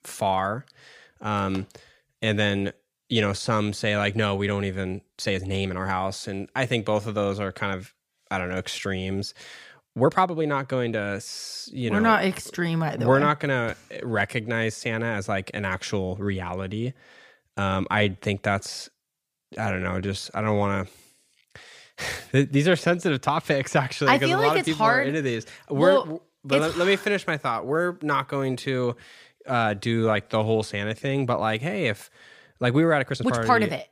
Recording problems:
uneven, jittery; strongly; from 5 to 33 s

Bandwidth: 15 kHz